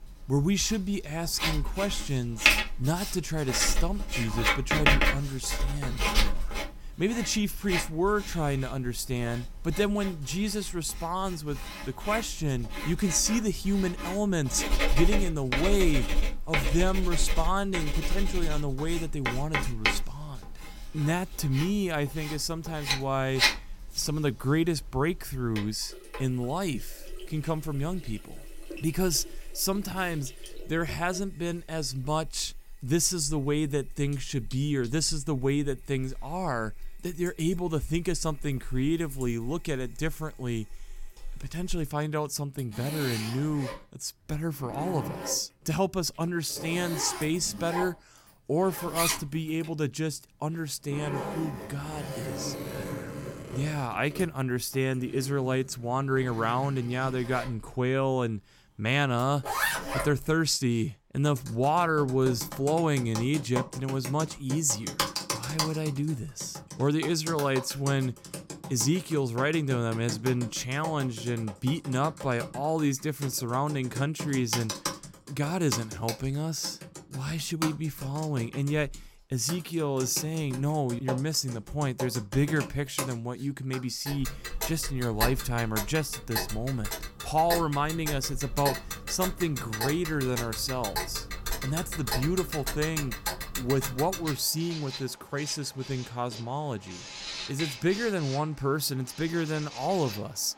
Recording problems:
household noises; loud; throughout; 4 dB below the speech

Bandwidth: 16.5 kHz